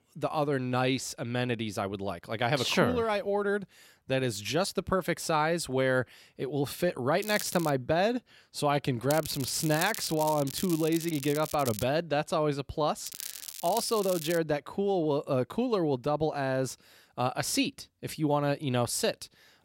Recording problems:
crackling; loud; at 7 s, from 9 to 12 s and from 13 to 14 s; 9 dB below the speech

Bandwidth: 16 kHz